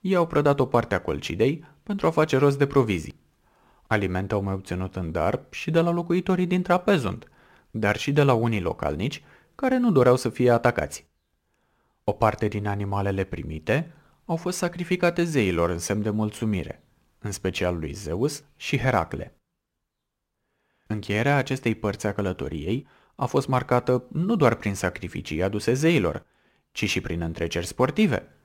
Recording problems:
none

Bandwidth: 16 kHz